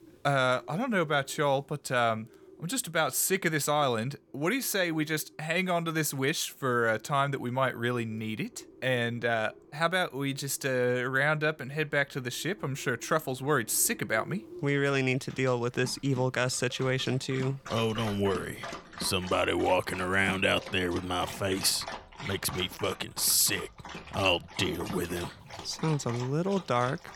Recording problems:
animal sounds; noticeable; throughout; 15 dB below the speech

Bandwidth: 18 kHz